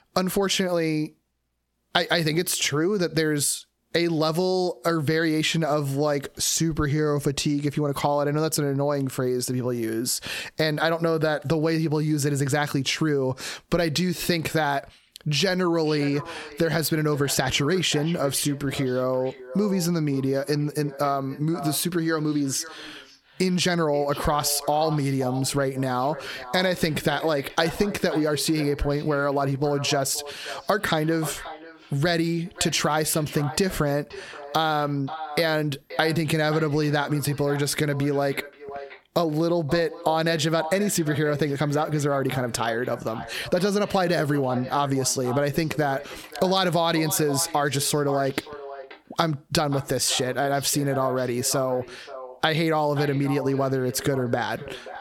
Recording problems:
squashed, flat; heavily
echo of what is said; noticeable; from 16 s on; 530 ms later, 15 dB below the speech

